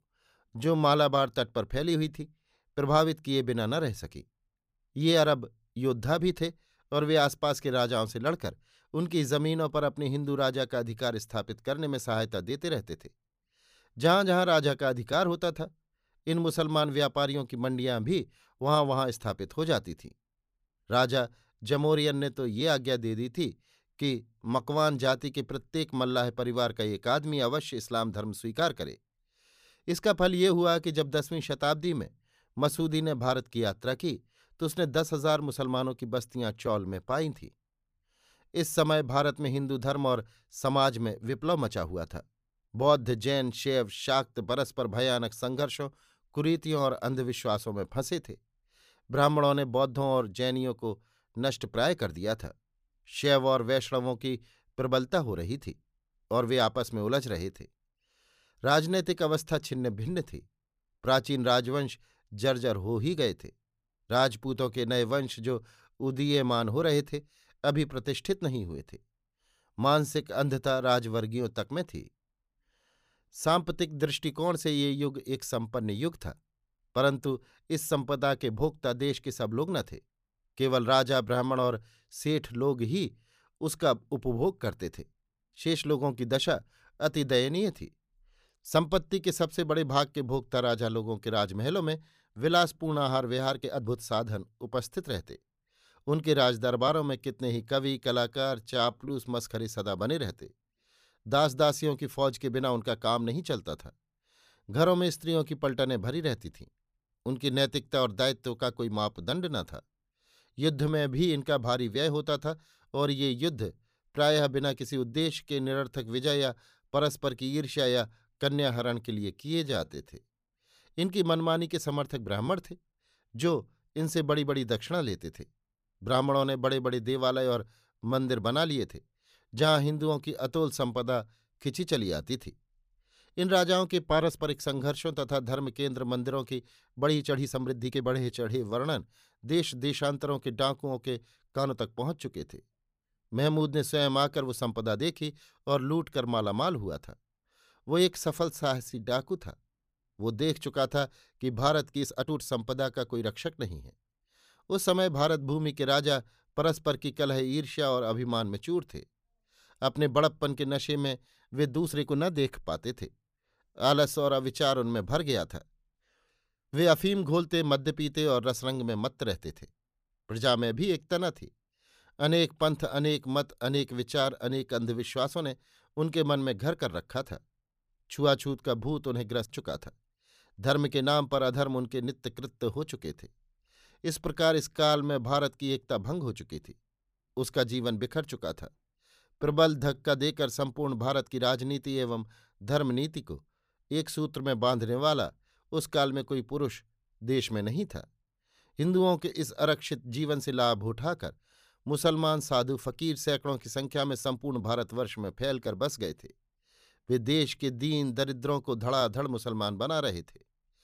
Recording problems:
uneven, jittery; strongly; from 0.5 s to 3:25

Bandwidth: 15 kHz